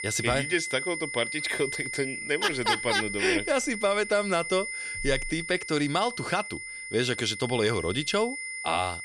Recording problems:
high-pitched whine; loud; throughout; 2 kHz, 6 dB below the speech

